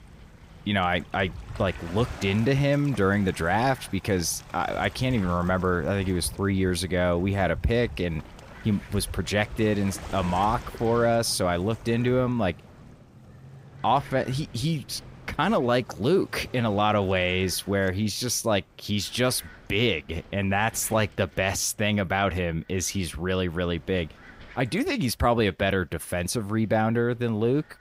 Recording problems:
rain or running water; noticeable; throughout; 20 dB below the speech
wind noise on the microphone; occasional gusts; 25 dB below the speech

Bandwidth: 15.5 kHz